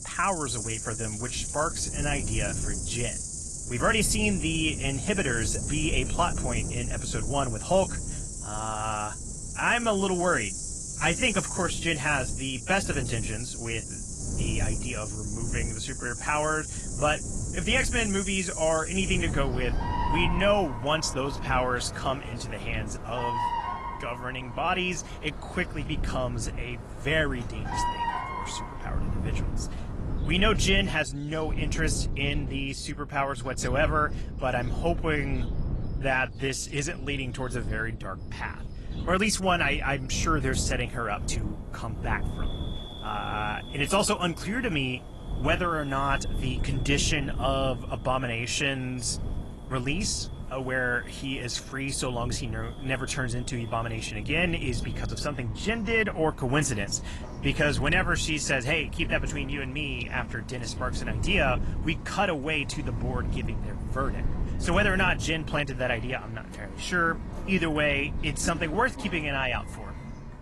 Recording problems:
garbled, watery; slightly; nothing above 11 kHz
animal sounds; loud; throughout; 8 dB below the speech
wind noise on the microphone; occasional gusts; 20 dB below the speech

